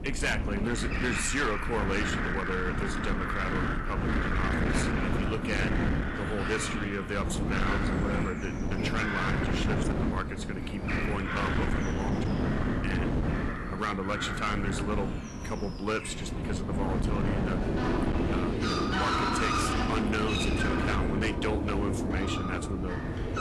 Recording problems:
distortion; slight; 15% of the sound clipped
garbled, watery; slightly; nothing above 11 kHz
animal sounds; very loud; throughout; as loud as the speech
wind noise on the microphone; heavy; 4 dB below the speech

